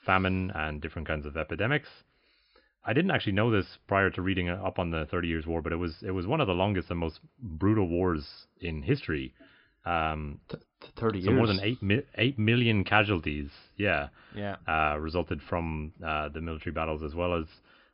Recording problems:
high frequencies cut off; noticeable; nothing above 5.5 kHz

